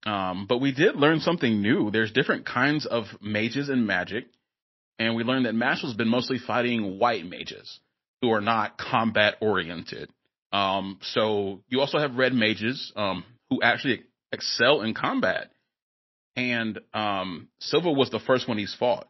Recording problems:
garbled, watery; slightly; nothing above 5.5 kHz

